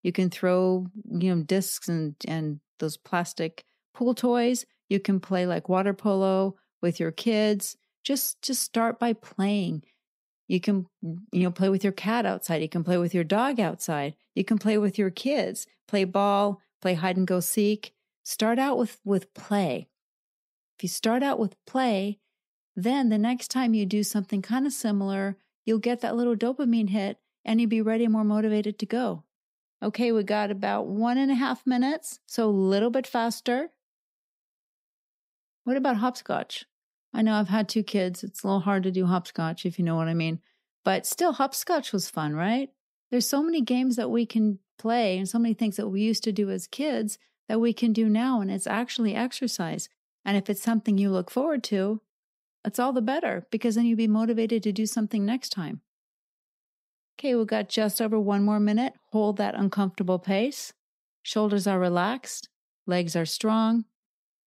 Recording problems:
none

